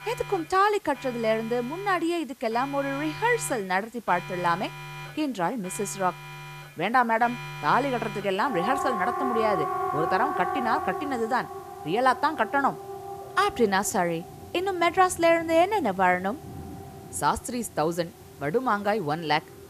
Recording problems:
alarms or sirens; loud; throughout; 9 dB below the speech
hiss; faint; throughout; 25 dB below the speech

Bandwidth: 14.5 kHz